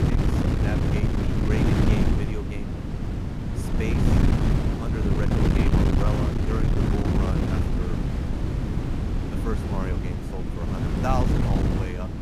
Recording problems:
wind noise on the microphone; heavy; 4 dB above the speech

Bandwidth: 14.5 kHz